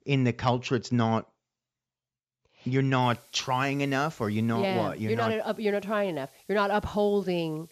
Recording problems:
high frequencies cut off; noticeable; nothing above 8 kHz
hiss; very faint; from 3 s on; 30 dB below the speech

